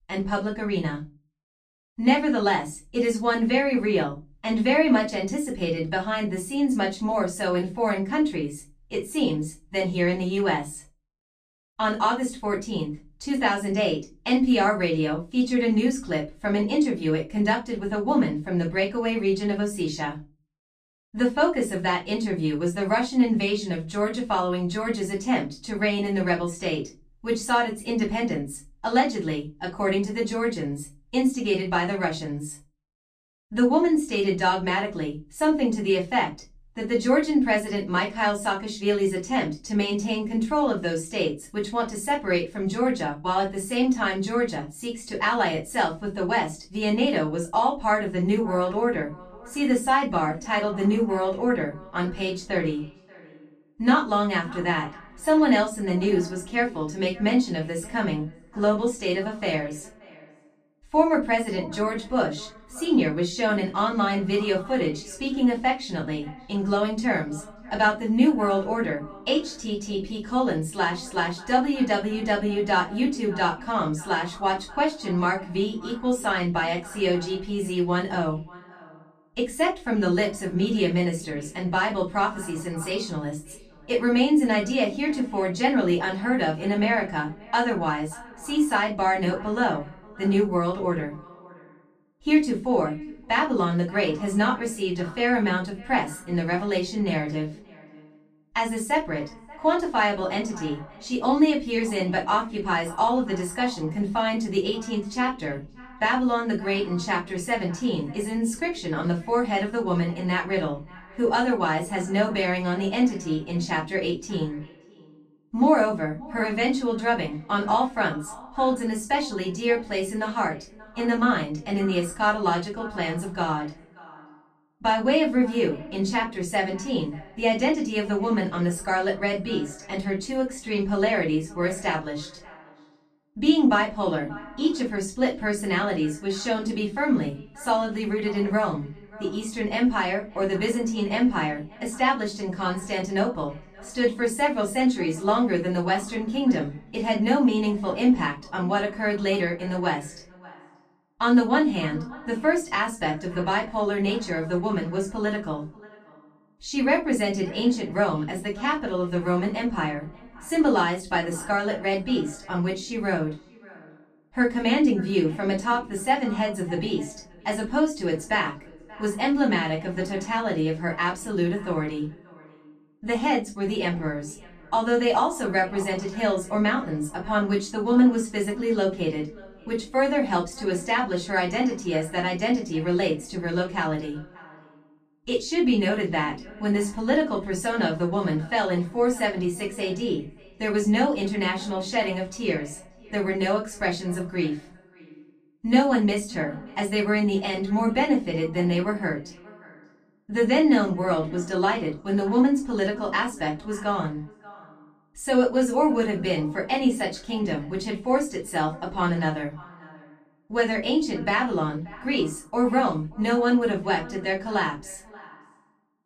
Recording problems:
off-mic speech; far
echo of what is said; faint; from 48 s on; 580 ms later, 20 dB below the speech
room echo; very slight; dies away in 0.2 s

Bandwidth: 13.5 kHz